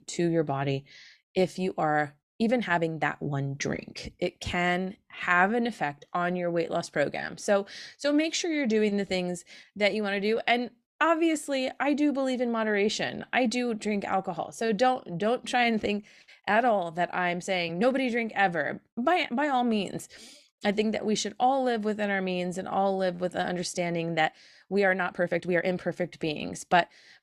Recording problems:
uneven, jittery; strongly; from 2.5 to 26 s

